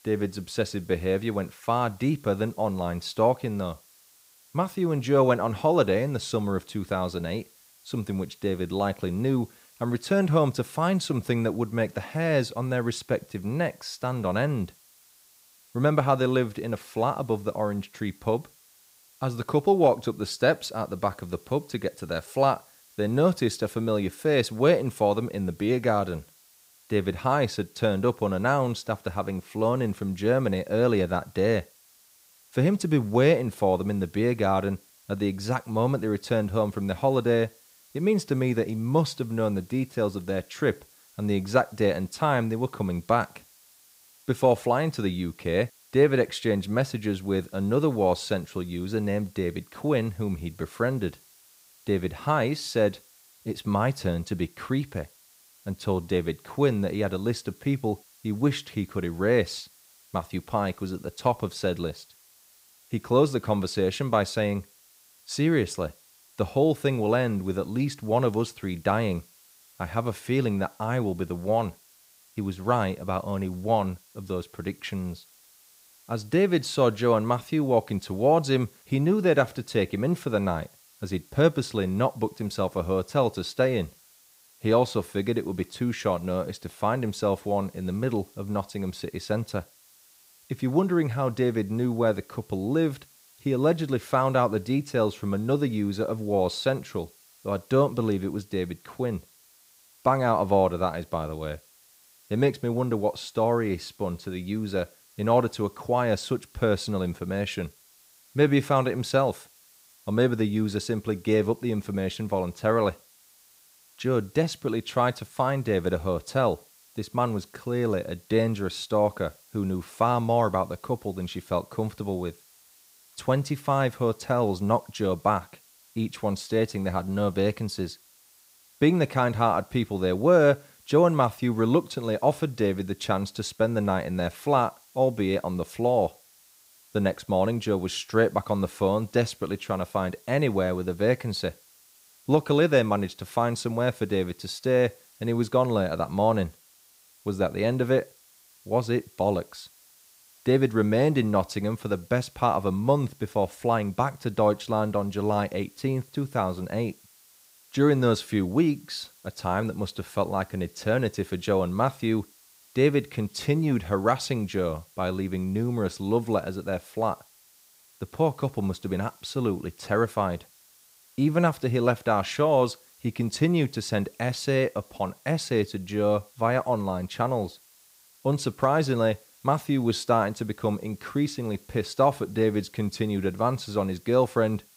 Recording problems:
hiss; faint; throughout; 30 dB below the speech

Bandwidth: 15.5 kHz